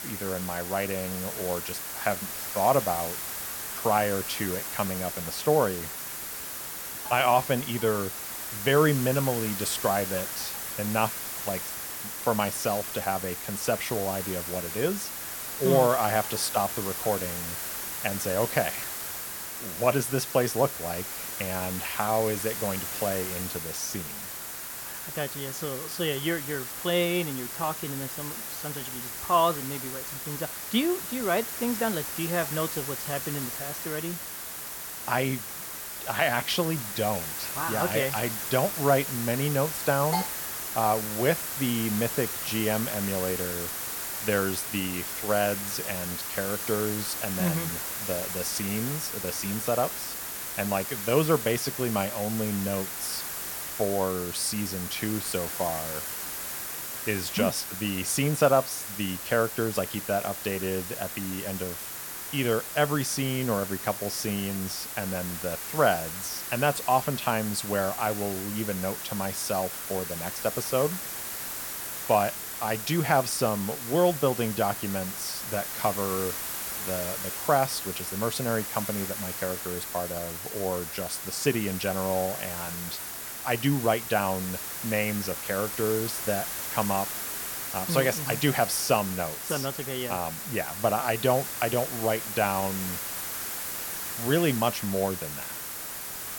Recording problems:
hiss; loud; throughout; 4 dB below the speech

